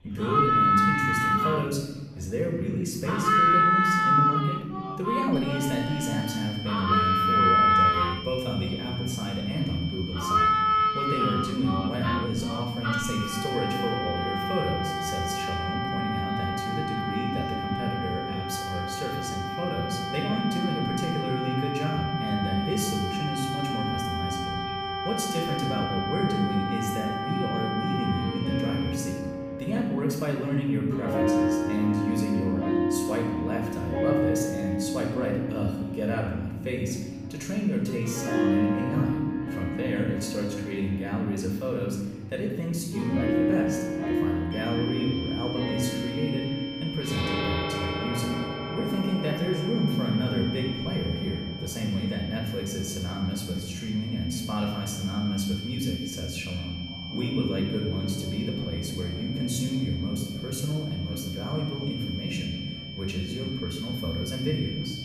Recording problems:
room echo; noticeable; dies away in 1.3 s
off-mic speech; somewhat distant
background music; very loud; throughout; 2 dB above the speech
high-pitched whine; loud; from 5.5 to 29 s and from 45 s on; 3 kHz, 8 dB below the speech
chatter from many people; faint; throughout; 25 dB below the speech

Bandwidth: 15 kHz